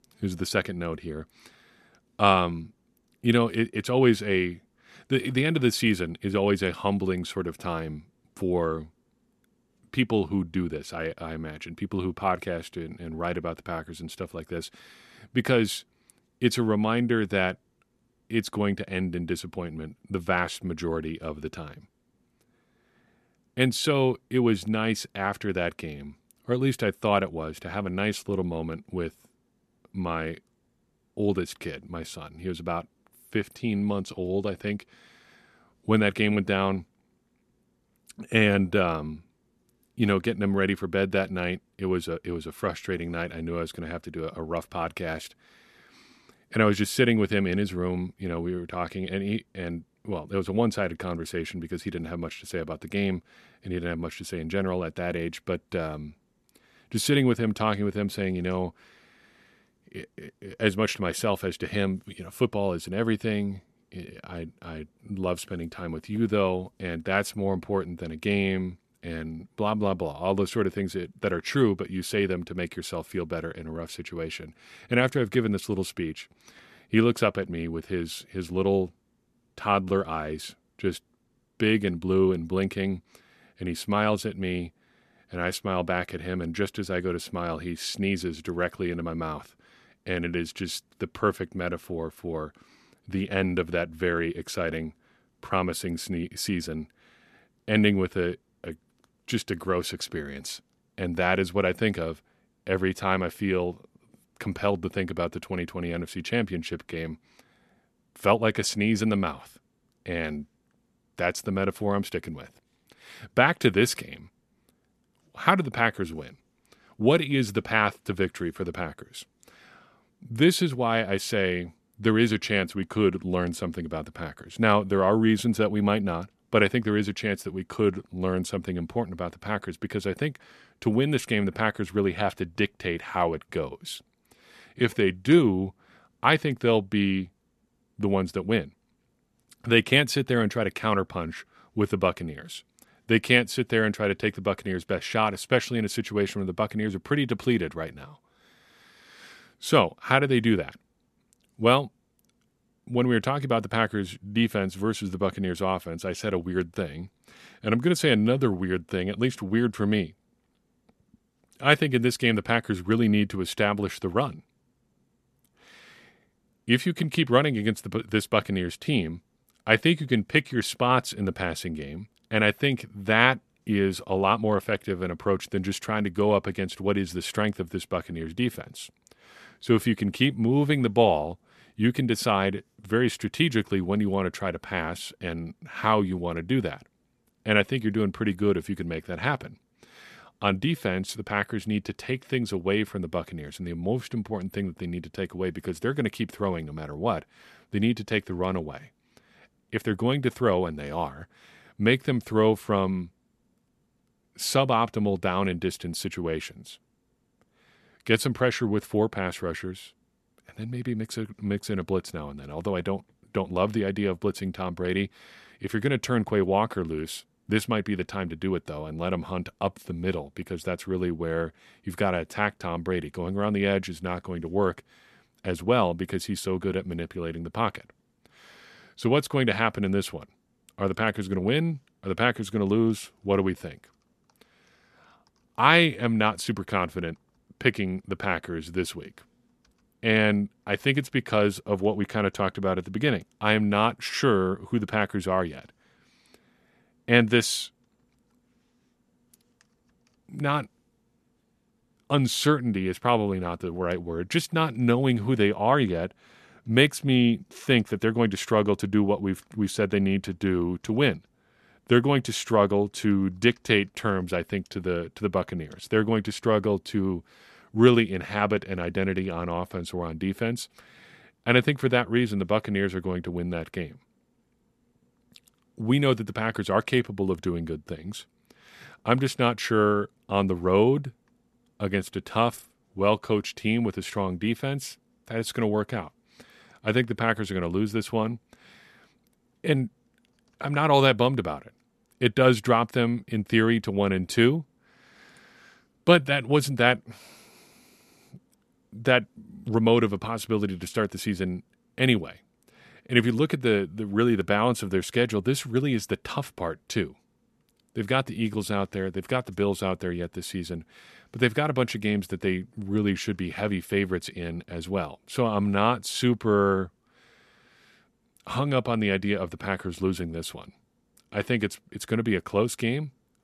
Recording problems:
none

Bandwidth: 13.5 kHz